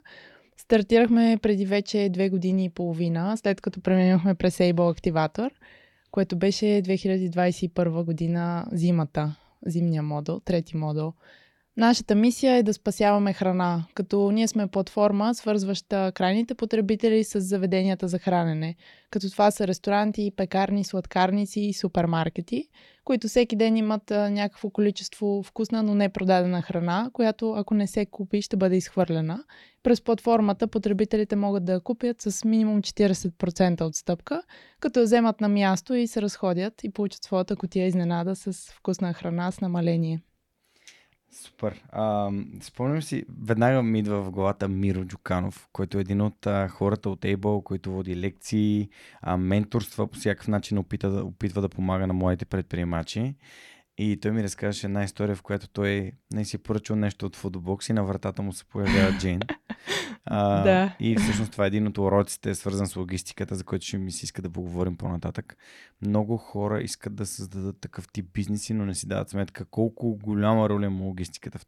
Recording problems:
none

